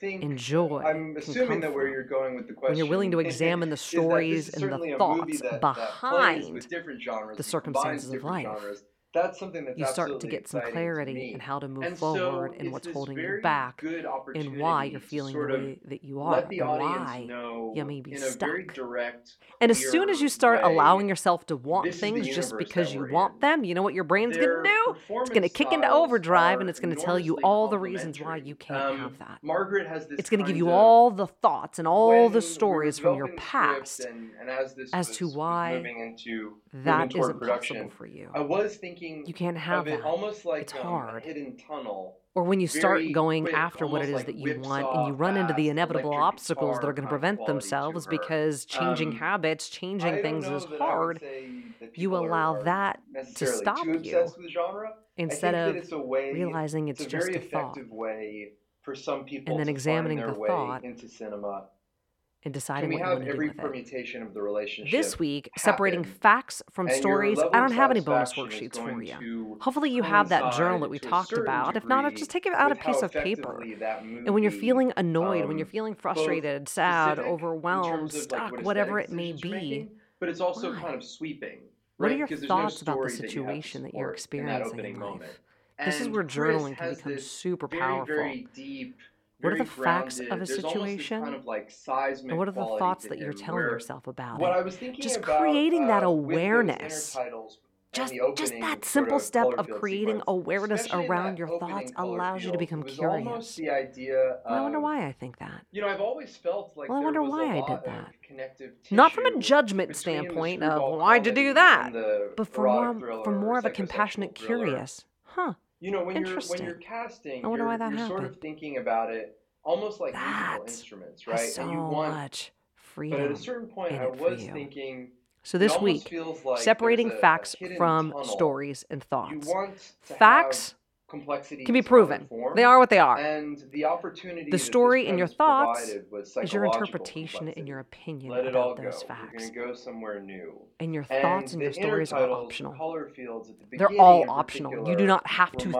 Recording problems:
voice in the background; loud; throughout; 6 dB below the speech

